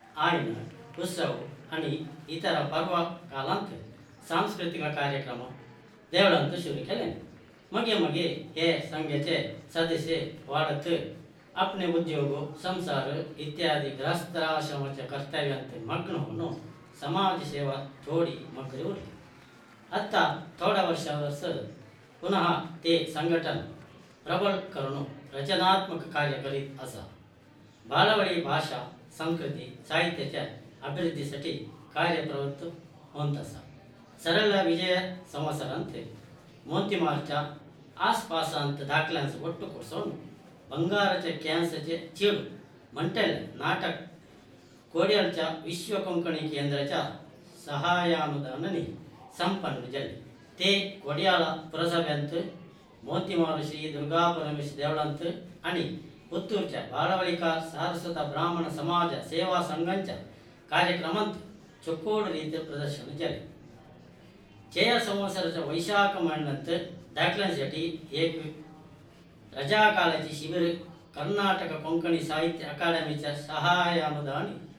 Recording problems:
off-mic speech; far
room echo; slight; dies away in 0.5 s
murmuring crowd; faint; throughout; 25 dB below the speech

